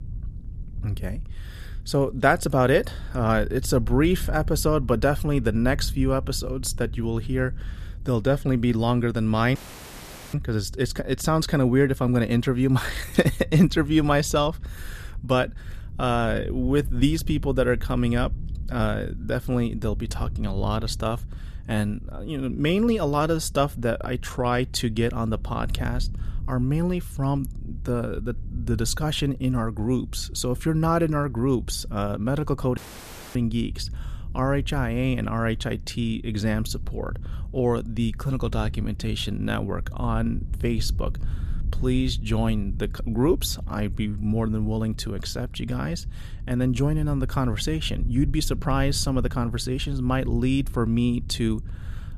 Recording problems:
low rumble; faint; throughout; 25 dB below the speech
audio cutting out; filled with static; at 9.5 s for 1 s and at 33 s for 0.5 s

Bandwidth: 14.5 kHz